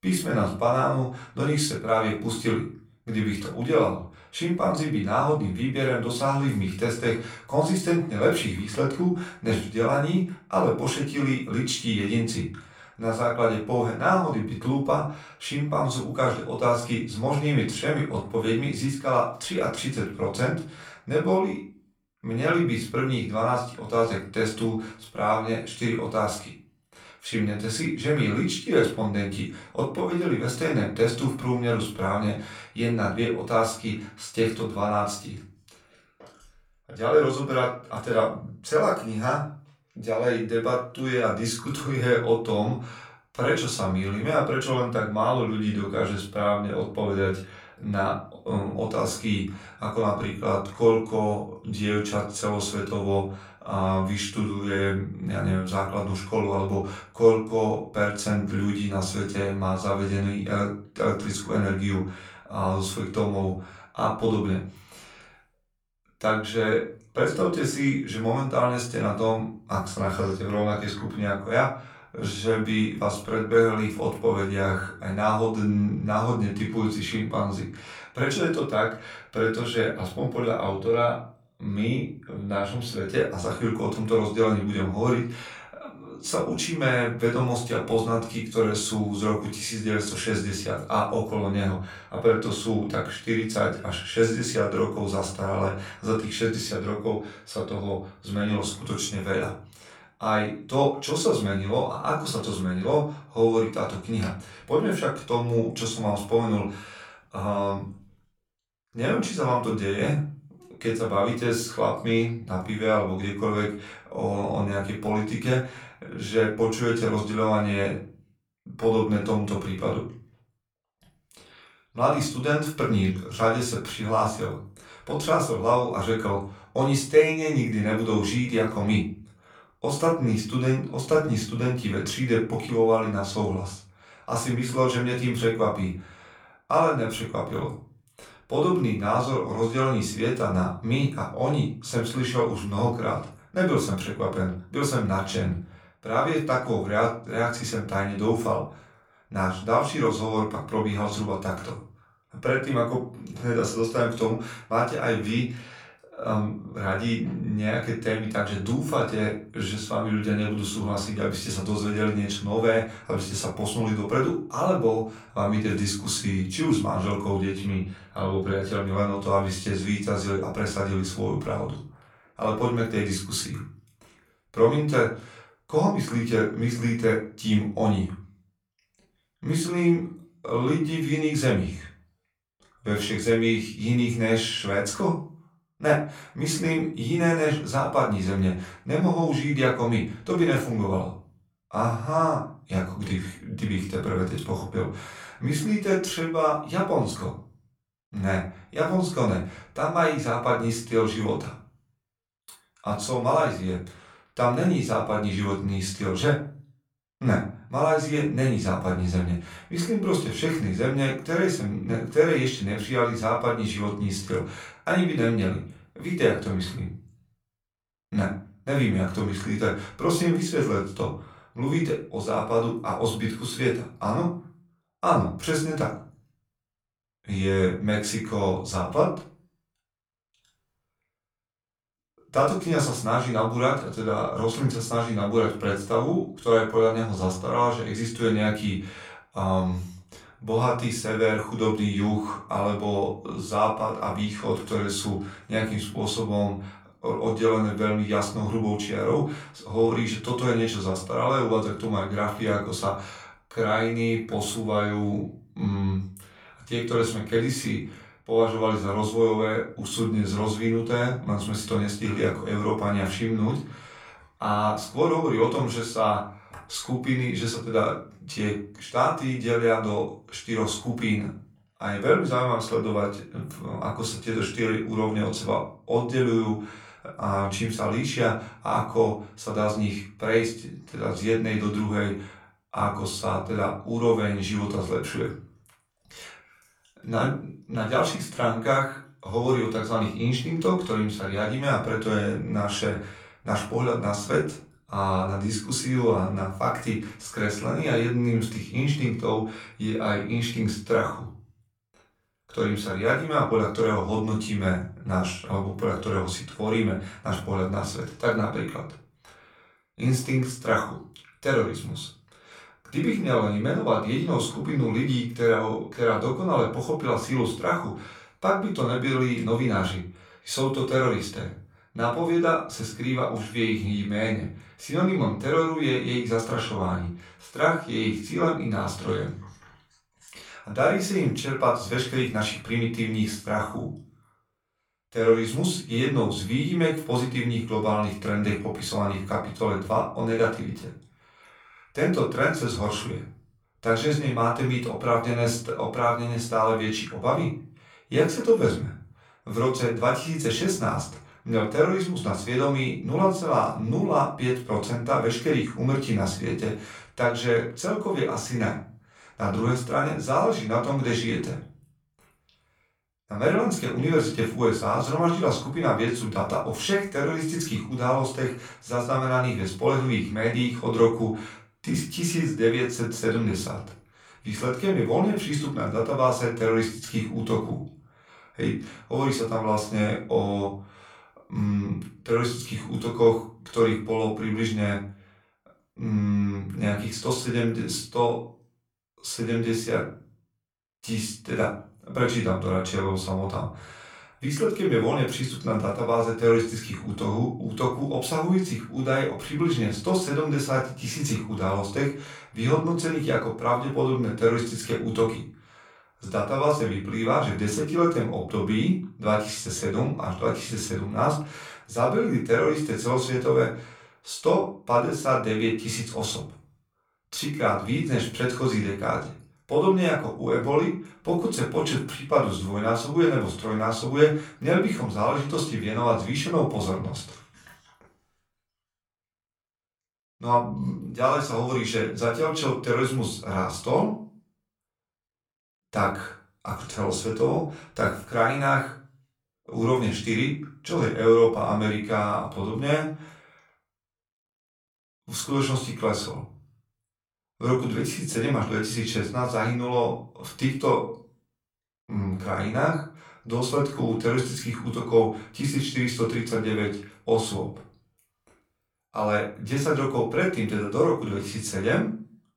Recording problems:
off-mic speech; far
room echo; slight; dies away in 0.4 s

